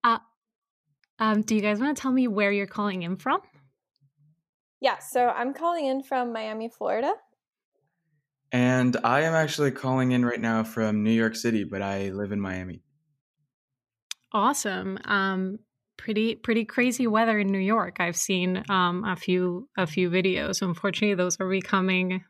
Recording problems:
none

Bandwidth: 14.5 kHz